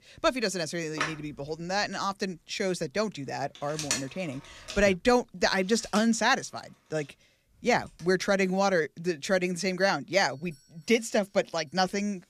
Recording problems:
alarms or sirens; loud; throughout; 8 dB below the speech

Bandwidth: 14.5 kHz